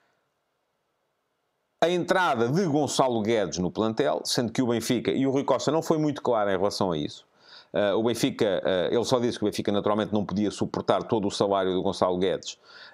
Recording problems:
squashed, flat; heavily

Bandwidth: 15.5 kHz